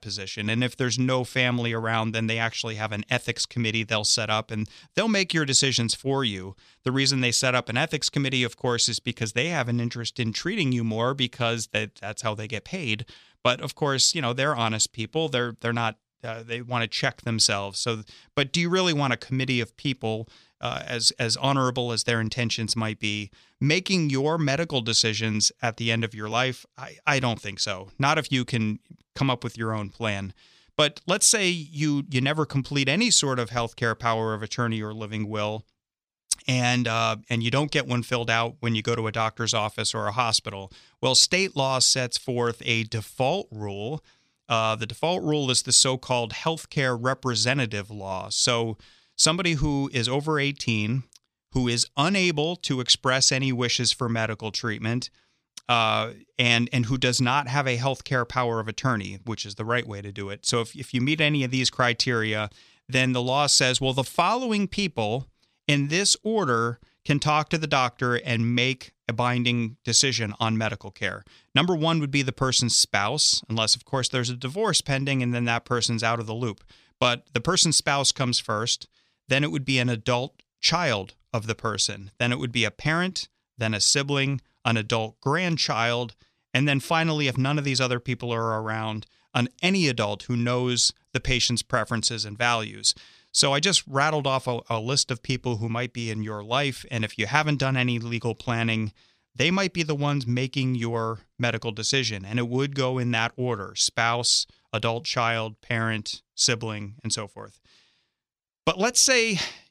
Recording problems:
none

